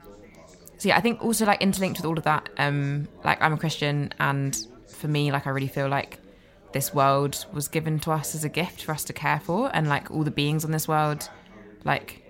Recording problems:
chatter from many people; faint; throughout; 25 dB below the speech

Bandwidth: 16 kHz